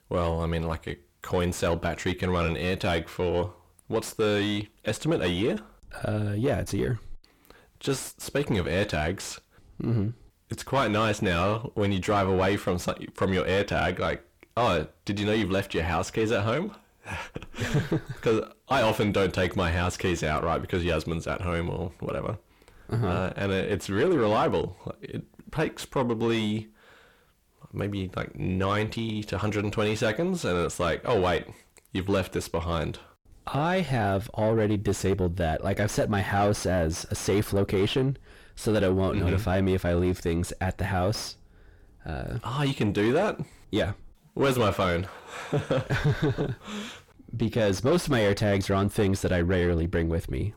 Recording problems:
distortion; heavy; 6 dB below the speech

